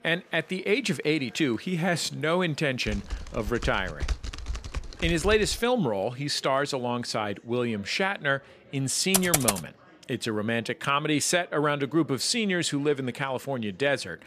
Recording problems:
chatter from many people; faint; throughout; 30 dB below the speech
keyboard typing; noticeable; from 3 to 5.5 s; peak 7 dB below the speech
keyboard typing; loud; at 9 s; peak 4 dB above the speech

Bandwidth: 14.5 kHz